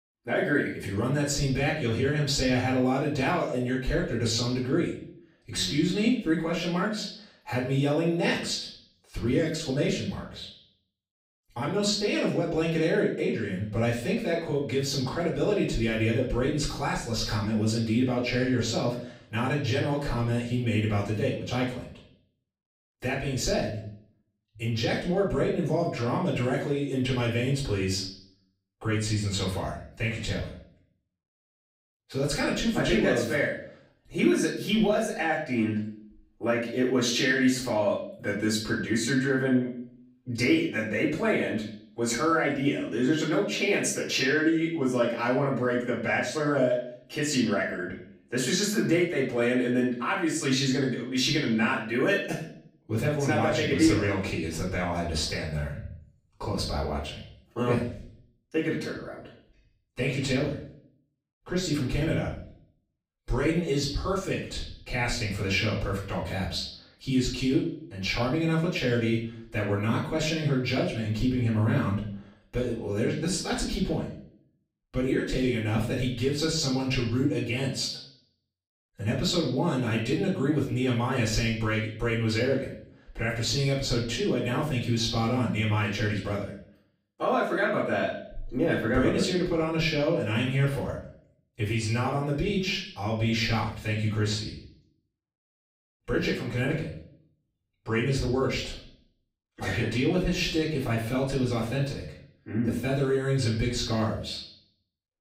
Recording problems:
off-mic speech; far
room echo; noticeable; dies away in 0.6 s

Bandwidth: 15.5 kHz